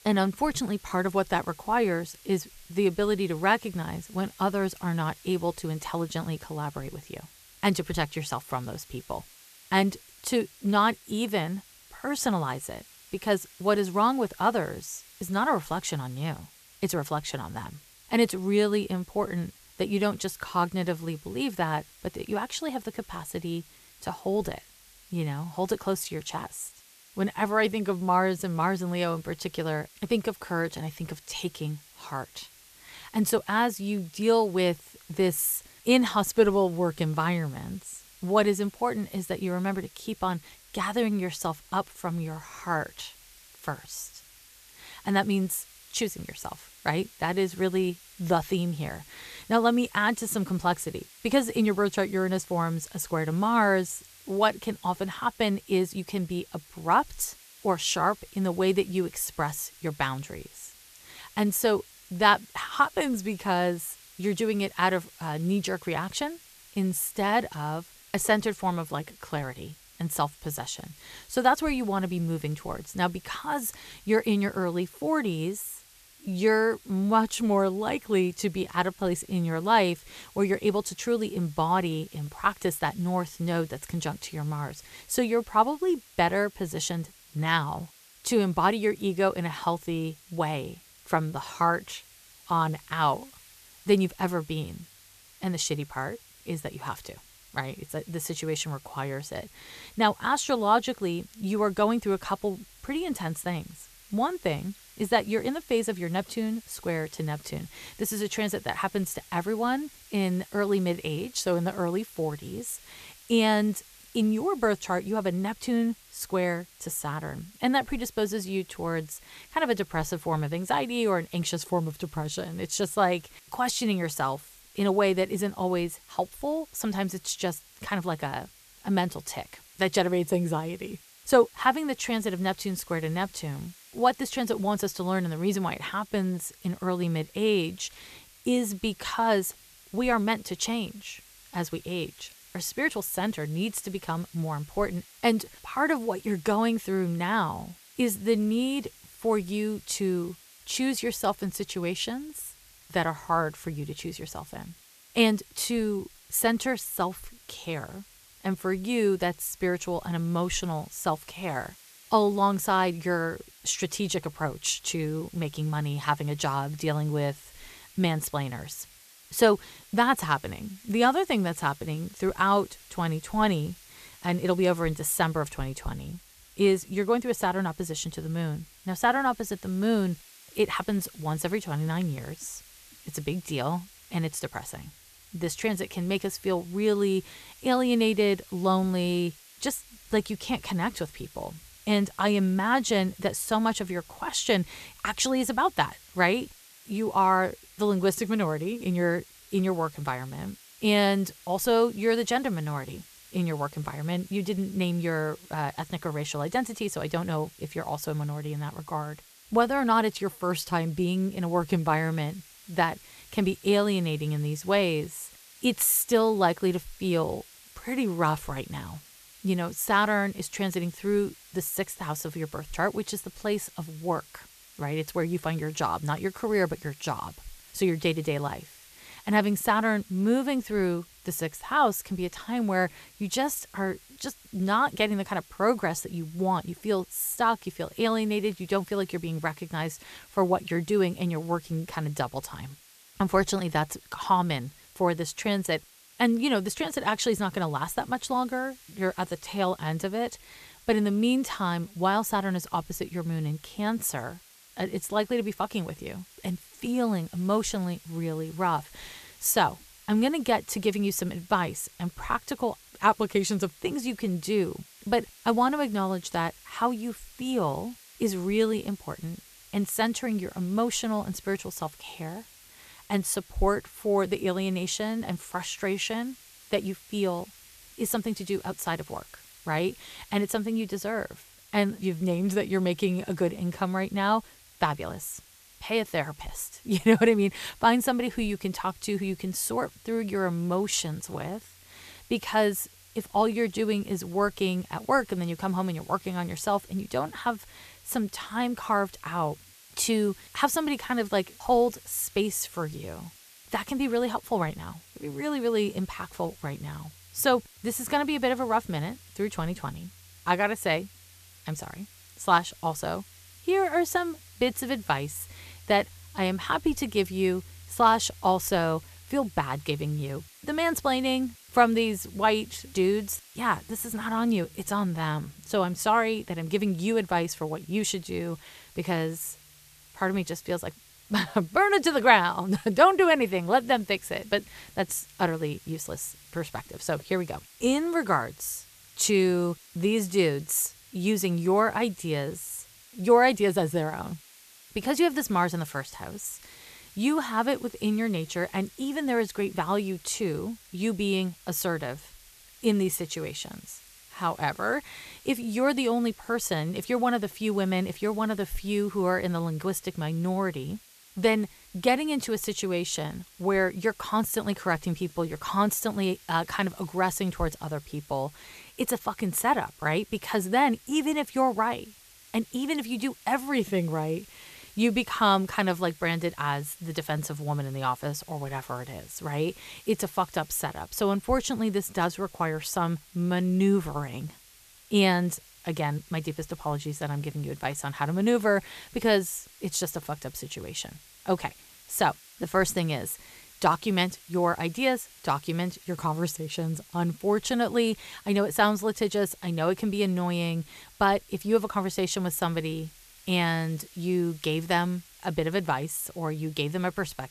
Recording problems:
hiss; faint; throughout; 25 dB below the speech

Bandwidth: 14.5 kHz